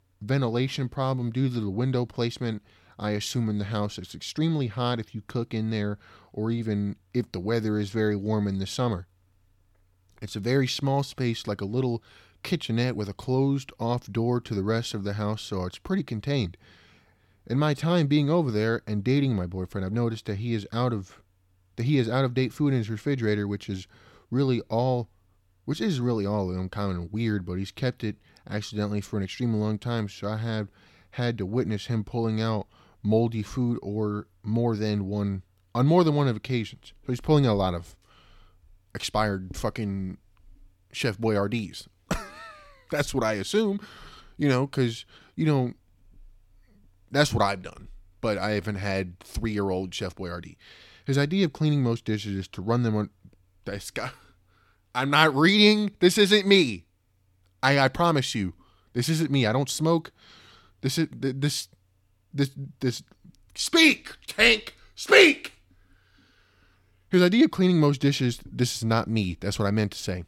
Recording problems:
none

